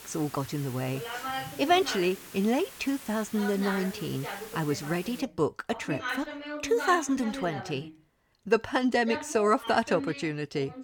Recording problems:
voice in the background; loud; throughout; 9 dB below the speech
hiss; noticeable; until 5 s; 15 dB below the speech

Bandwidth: 18.5 kHz